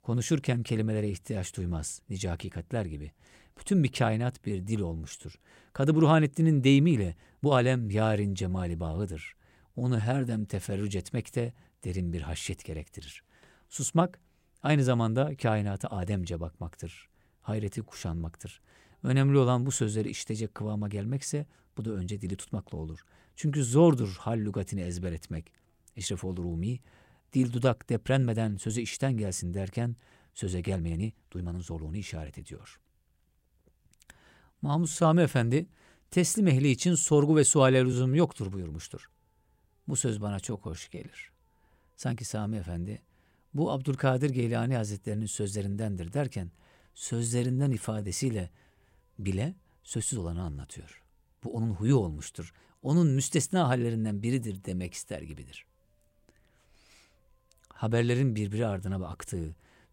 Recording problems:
uneven, jittery; strongly; from 4.5 to 55 s

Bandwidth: 16 kHz